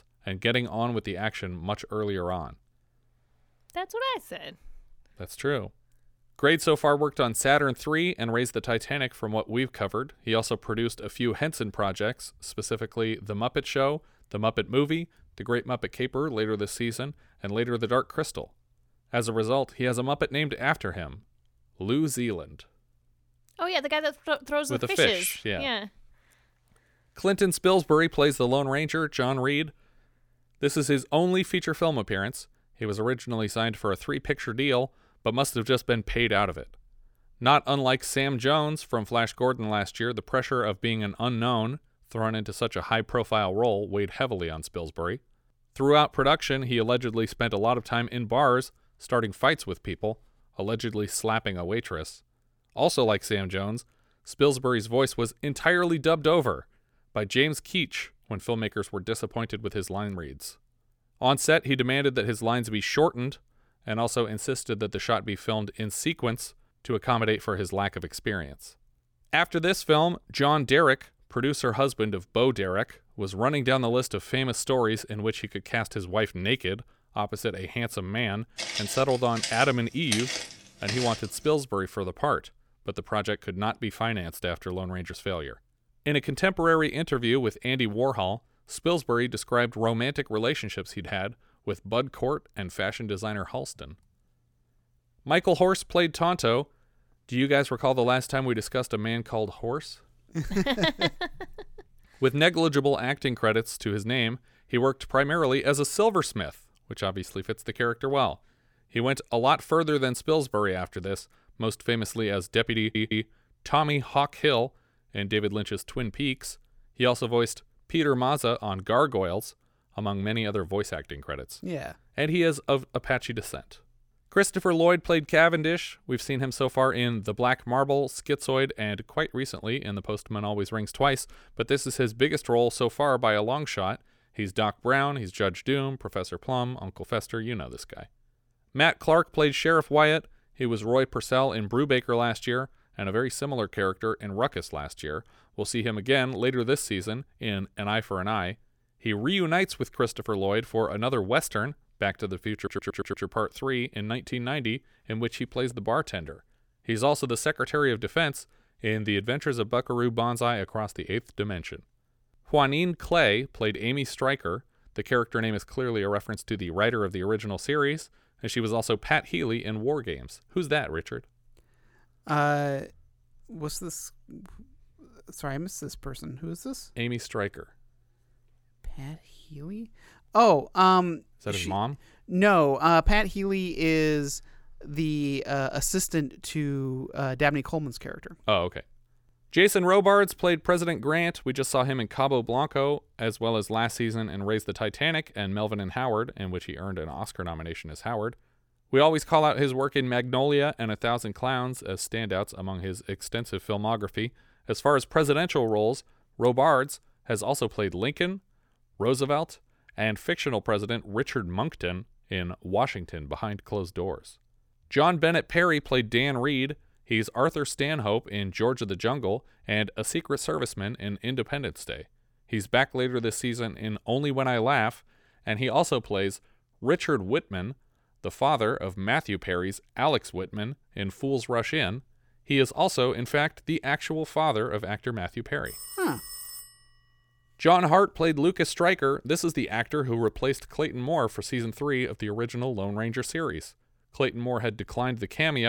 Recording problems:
footsteps; noticeable; from 1:19 to 1:21; peak 2 dB below the speech
audio stuttering; at 1:53 and at 2:33
phone ringing; faint; from 3:56 to 3:57; peak 10 dB below the speech
abrupt cut into speech; at the end

